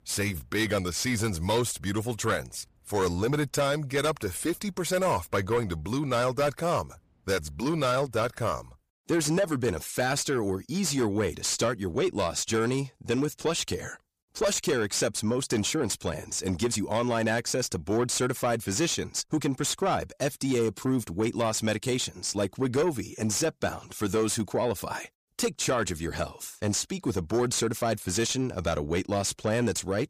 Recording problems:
distortion; slight; 10 dB below the speech

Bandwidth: 15 kHz